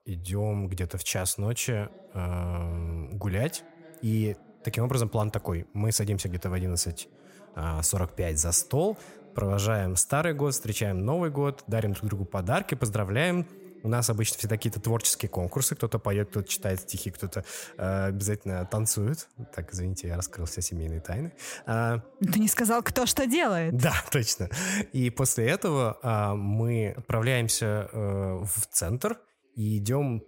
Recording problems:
voice in the background; faint; throughout; 25 dB below the speech

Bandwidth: 16 kHz